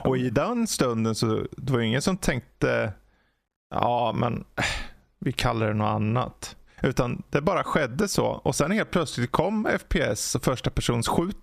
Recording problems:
squashed, flat; heavily

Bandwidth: 14.5 kHz